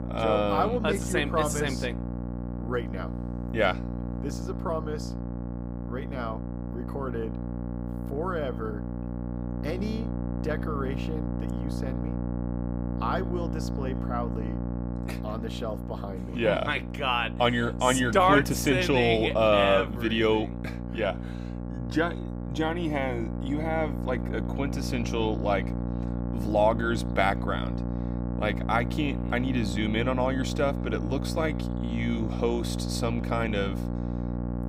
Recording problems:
electrical hum; noticeable; throughout; 60 Hz, 10 dB below the speech

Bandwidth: 15.5 kHz